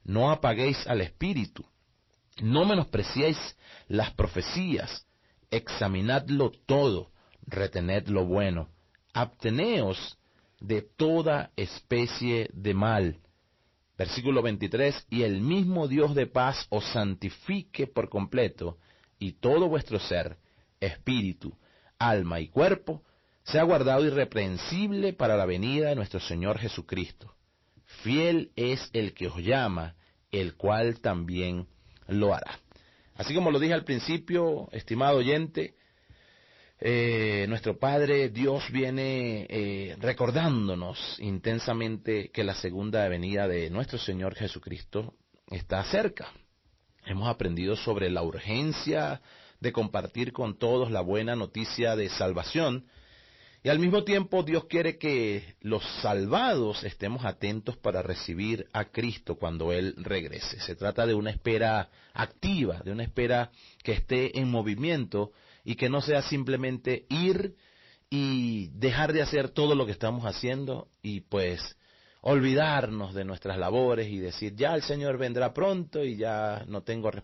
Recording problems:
distortion; slight; 10 dB below the speech
garbled, watery; slightly; nothing above 5.5 kHz

